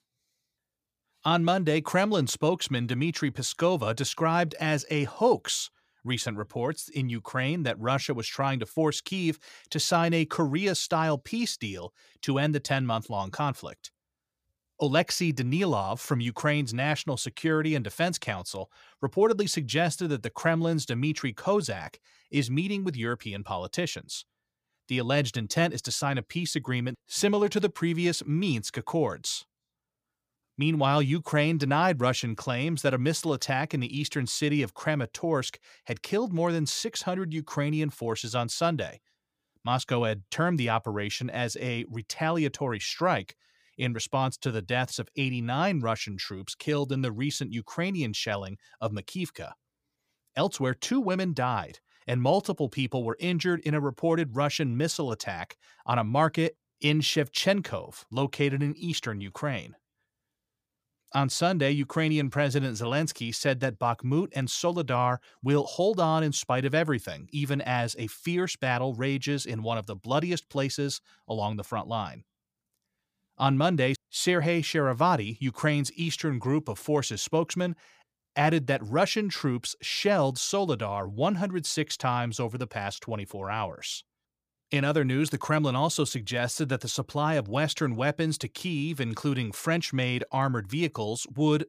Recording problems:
none

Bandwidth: 15 kHz